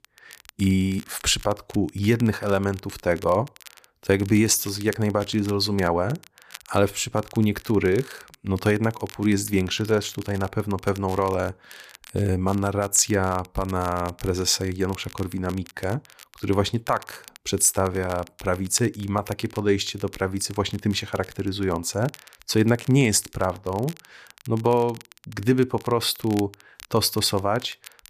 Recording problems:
crackle, like an old record; faint; 20 dB below the speech

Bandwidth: 14.5 kHz